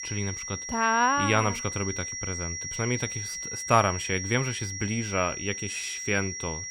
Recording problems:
high-pitched whine; loud; throughout; 5.5 kHz, 5 dB below the speech

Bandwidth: 16 kHz